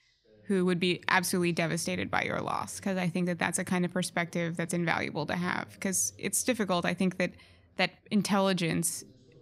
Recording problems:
voice in the background; faint; throughout; 30 dB below the speech

